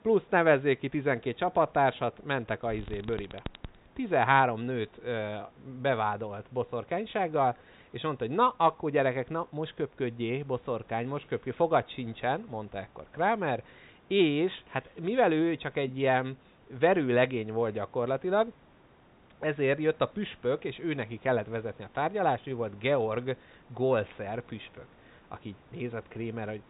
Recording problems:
high frequencies cut off; severe; nothing above 4 kHz
hiss; faint; throughout; 30 dB below the speech
alarm; faint; at 2.5 s; peak 15 dB below the speech

